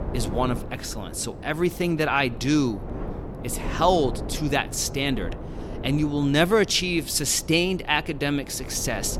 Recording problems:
wind noise on the microphone; occasional gusts; 15 dB below the speech

